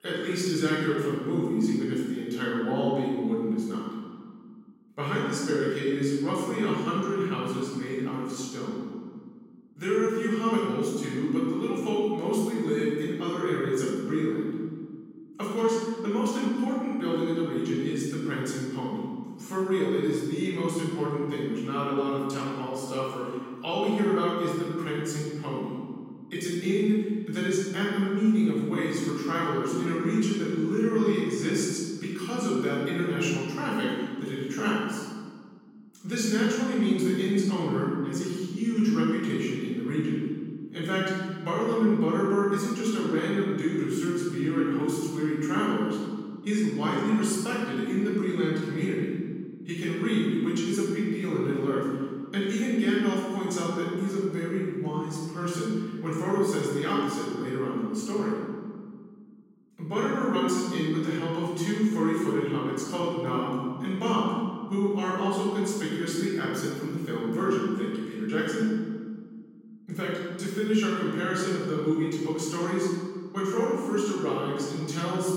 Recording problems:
room echo; strong; dies away in 1.7 s
off-mic speech; far

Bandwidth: 16.5 kHz